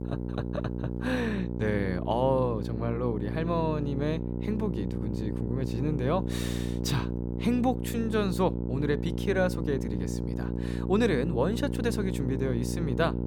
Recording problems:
electrical hum; loud; throughout; 60 Hz, 7 dB below the speech

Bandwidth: 18 kHz